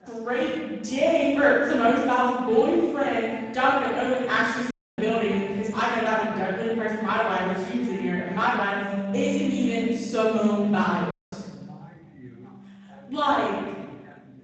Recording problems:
room echo; strong; dies away in 1.3 s
off-mic speech; far
garbled, watery; slightly; nothing above 7.5 kHz
background music; noticeable; throughout; 15 dB below the speech
background chatter; faint; throughout; 2 voices, 25 dB below the speech
audio cutting out; at 4.5 s and at 11 s

